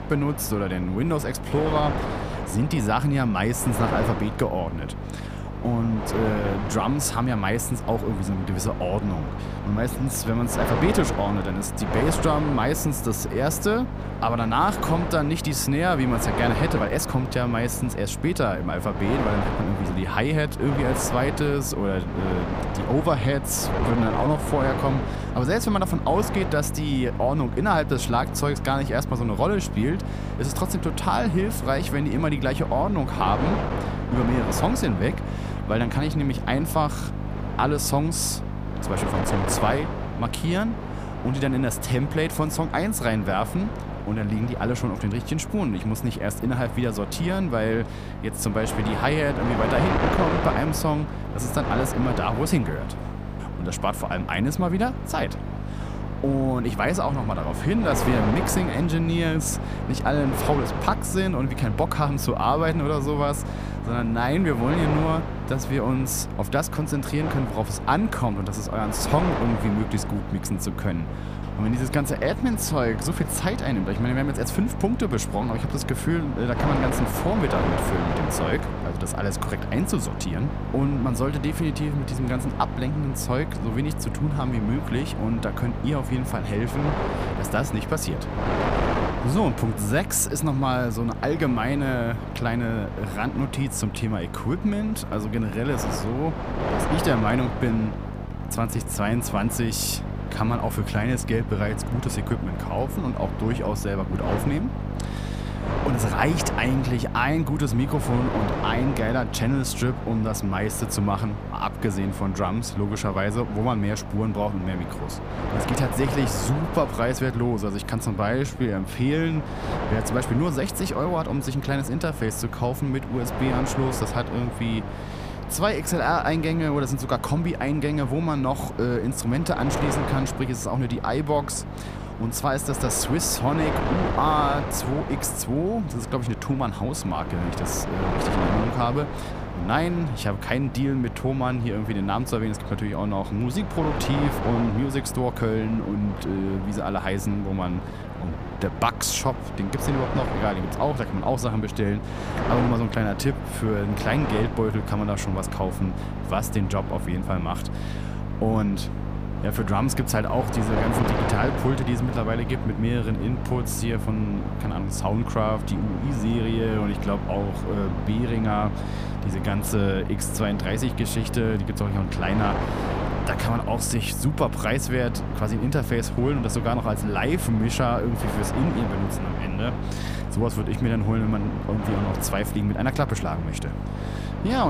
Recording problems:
wind noise on the microphone; heavy; 6 dB below the speech
electrical hum; noticeable; throughout; 50 Hz, 15 dB below the speech
uneven, jittery; strongly; from 17 s to 2:29
abrupt cut into speech; at the end

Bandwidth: 15 kHz